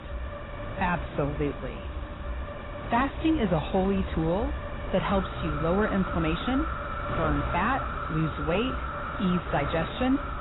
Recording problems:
distortion; heavy; 8 dB below the speech
garbled, watery; badly; nothing above 4 kHz
wind noise on the microphone; heavy; 8 dB below the speech
animal sounds; loud; throughout; 8 dB below the speech
traffic noise; noticeable; throughout; 15 dB below the speech

